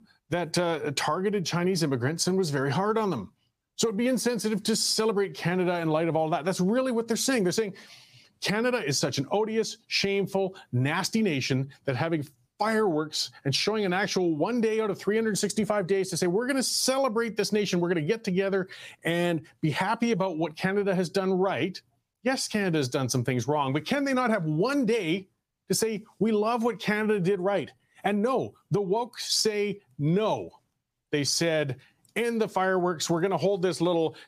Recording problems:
squashed, flat; somewhat

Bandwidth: 15 kHz